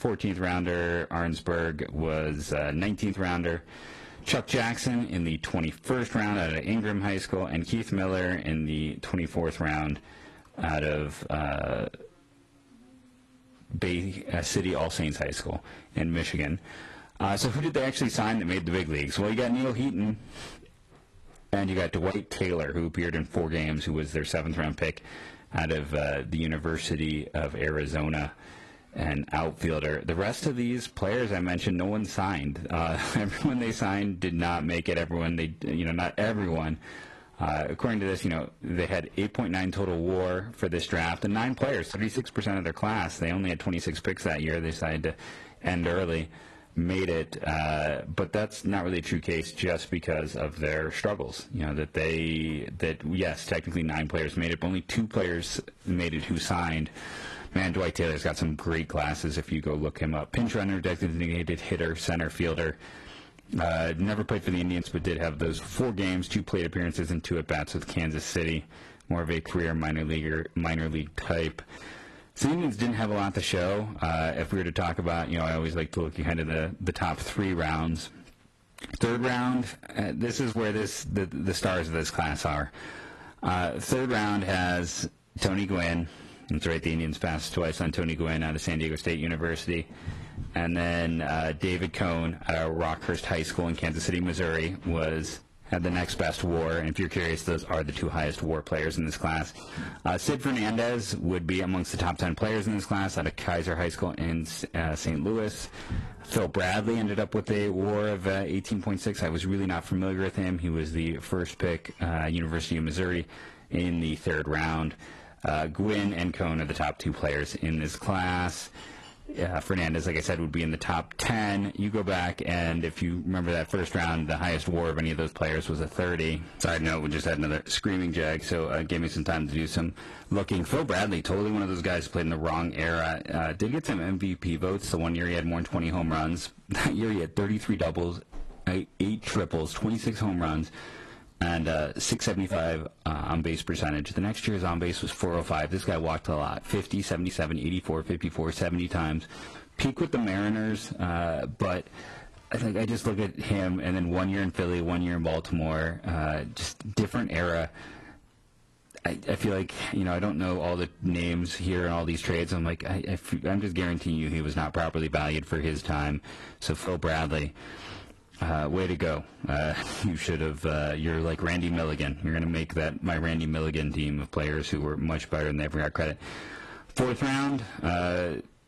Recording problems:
distortion; slight; 4% of the sound clipped
garbled, watery; slightly; nothing above 12 kHz
squashed, flat; somewhat

